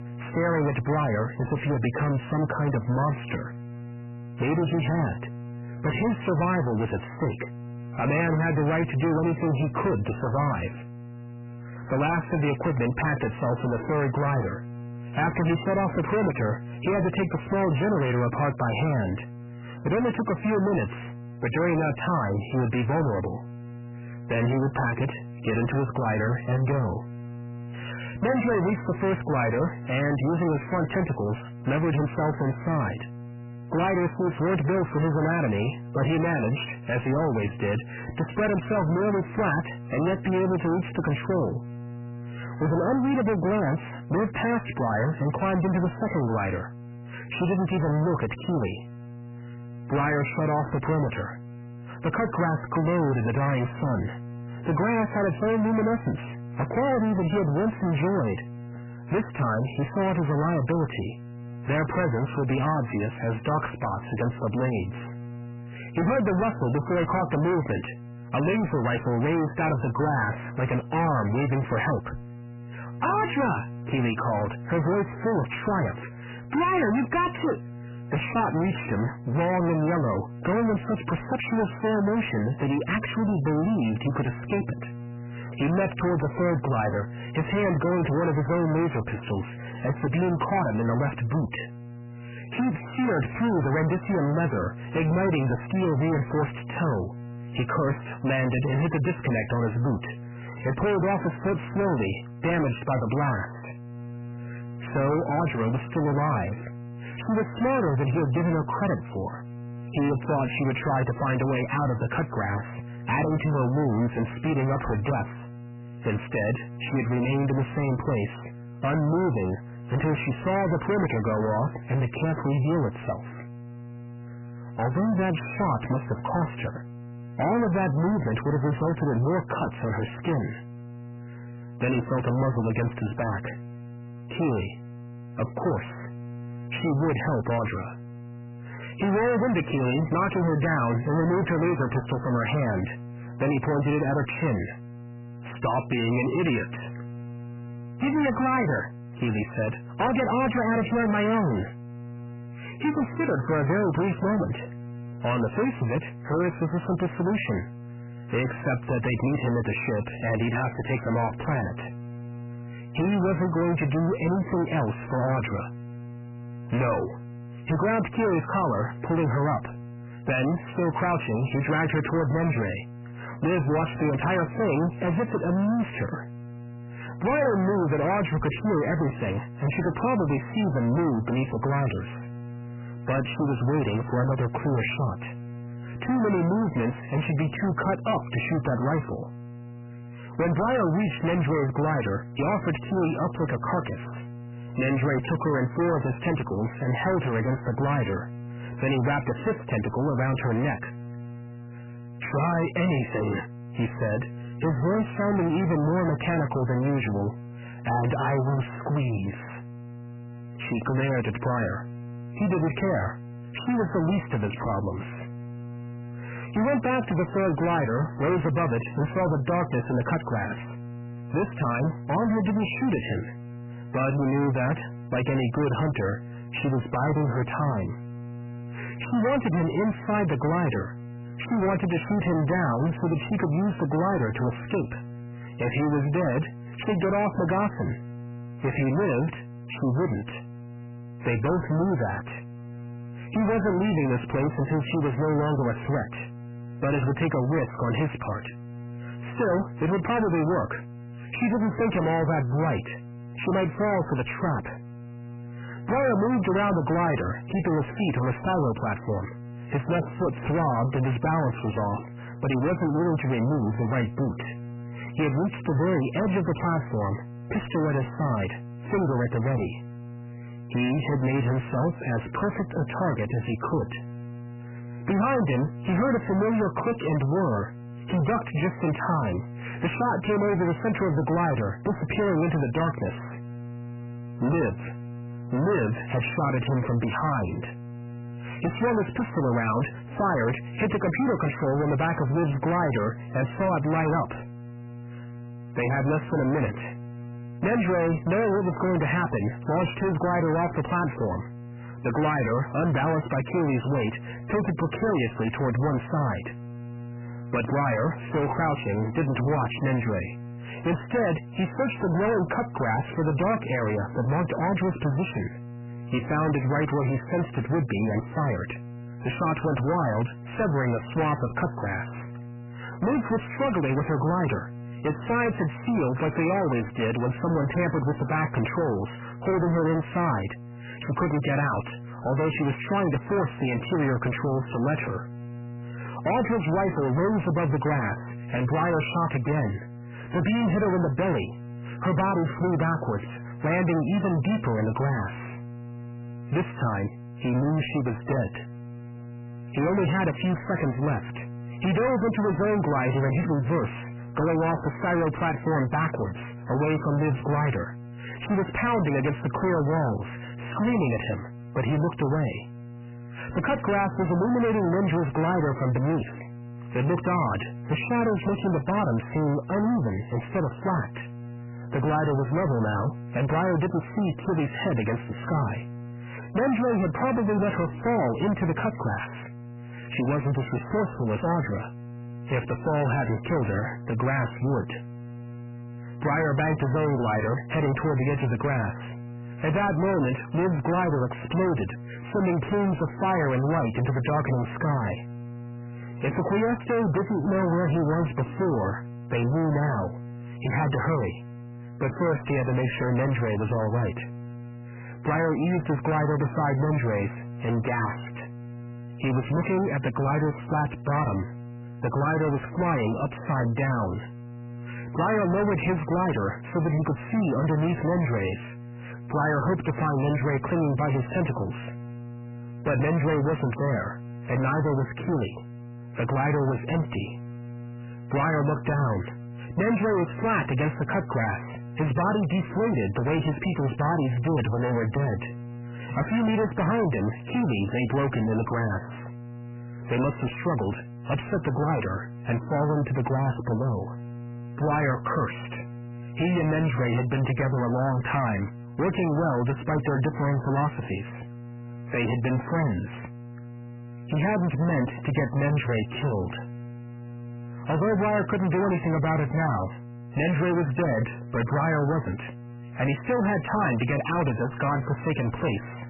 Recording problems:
distortion; heavy; 6 dB below the speech
garbled, watery; badly; nothing above 3 kHz
electrical hum; noticeable; throughout; 60 Hz, 20 dB below the speech

